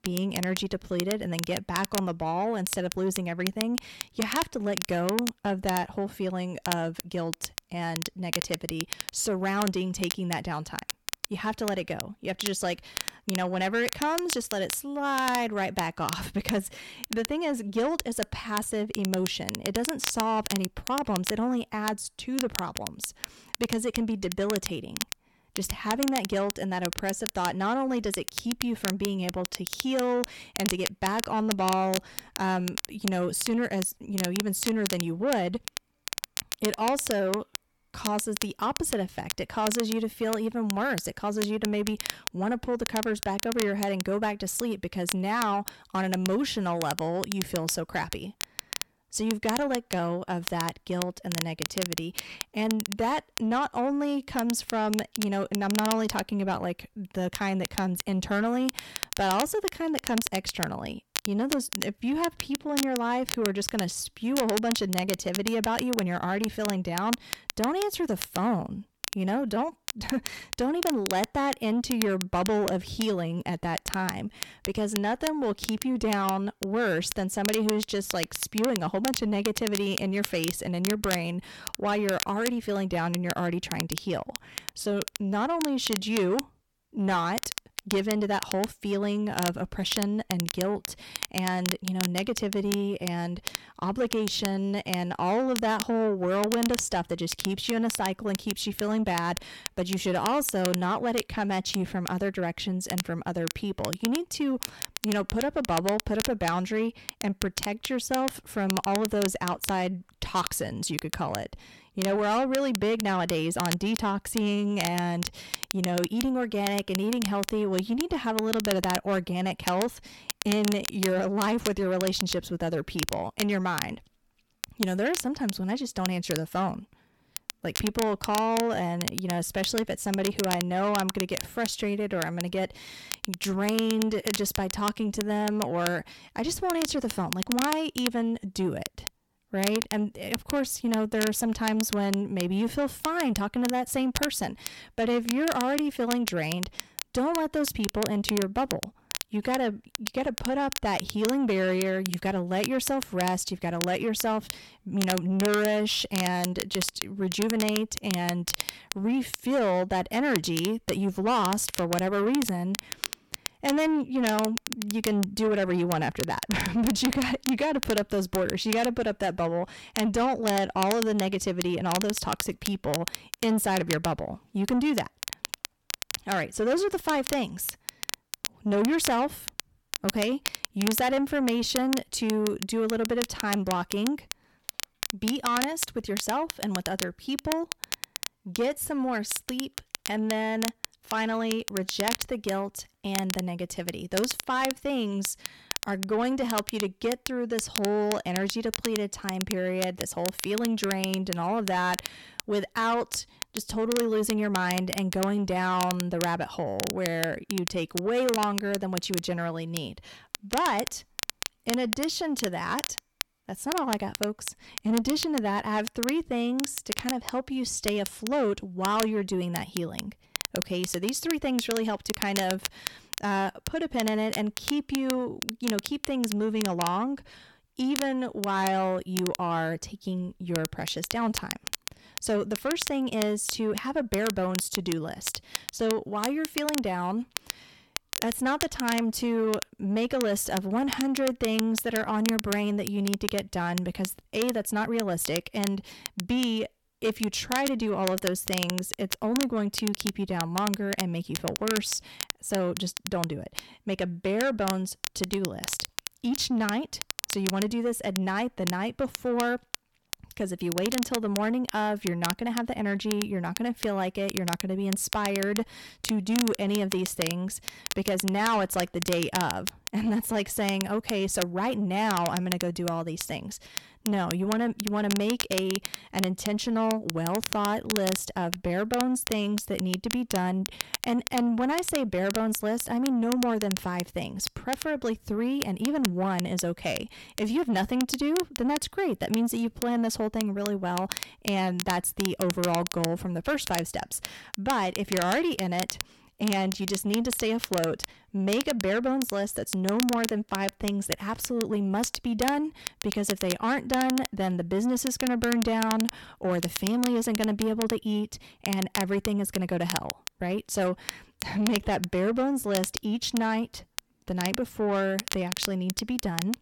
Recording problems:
distortion; slight; 10 dB below the speech
crackle, like an old record; loud; 7 dB below the speech

